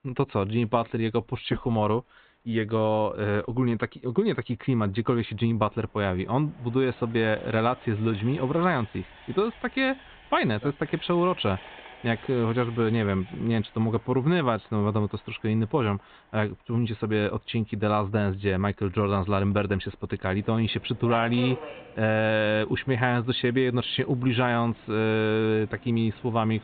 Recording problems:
high frequencies cut off; severe; nothing above 4 kHz
train or aircraft noise; faint; throughout; 20 dB below the speech

